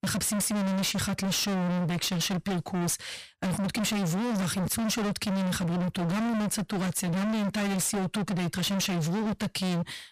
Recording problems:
distortion; heavy; 55% of the sound clipped

